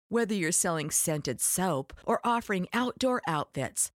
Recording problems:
none

